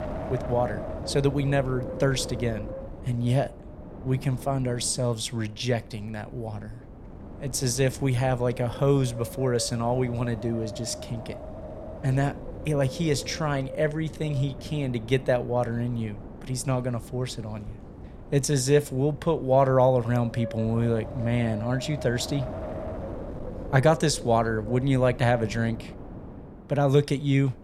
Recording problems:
wind noise on the microphone; occasional gusts; 15 dB below the speech

